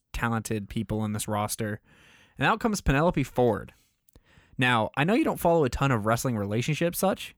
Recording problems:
none

